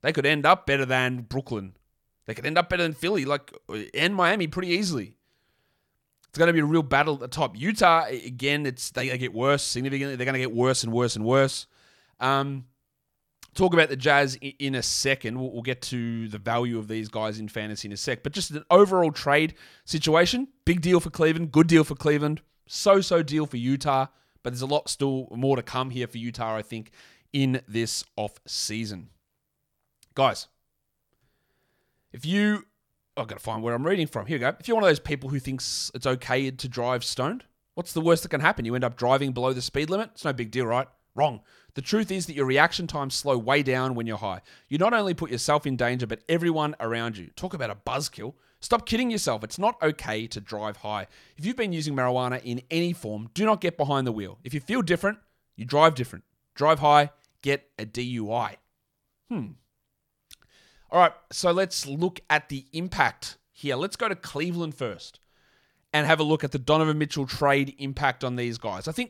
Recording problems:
none

